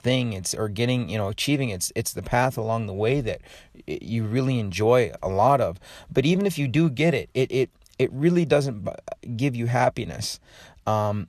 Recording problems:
none

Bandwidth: 13.5 kHz